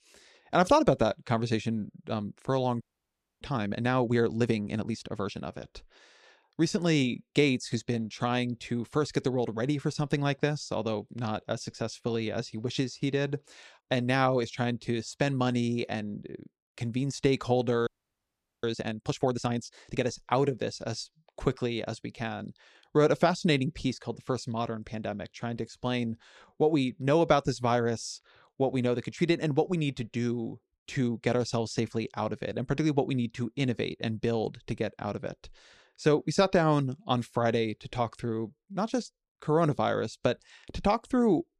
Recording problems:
audio freezing; at 3 s for 0.5 s and at 18 s for 1 s

